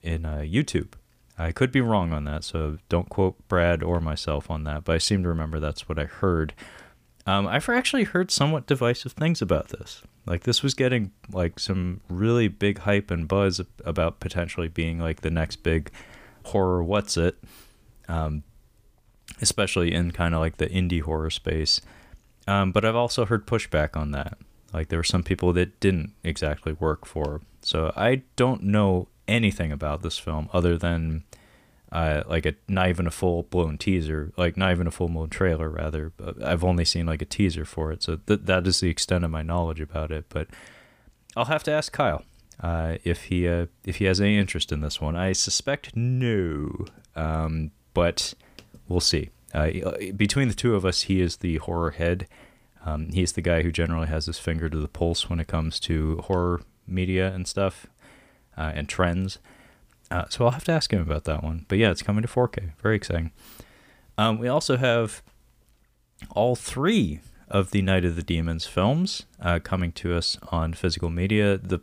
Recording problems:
none

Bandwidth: 15 kHz